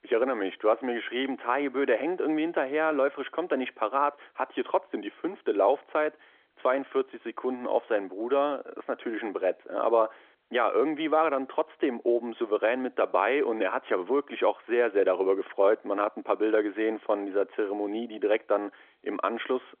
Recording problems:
phone-call audio; nothing above 3.5 kHz

